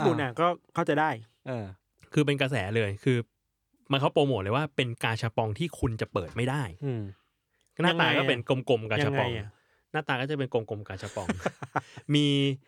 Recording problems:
abrupt cut into speech; at the start

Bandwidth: 18.5 kHz